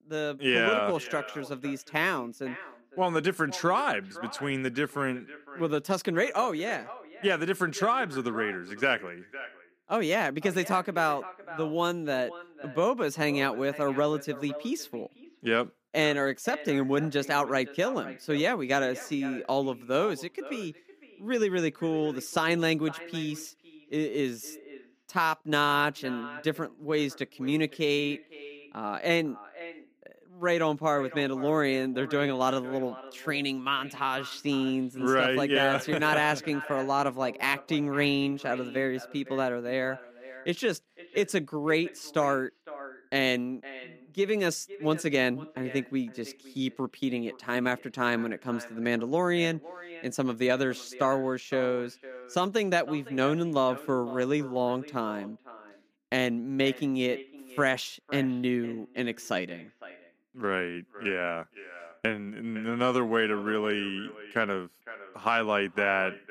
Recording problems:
echo of what is said; noticeable; throughout; 510 ms later, 15 dB below the speech

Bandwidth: 15 kHz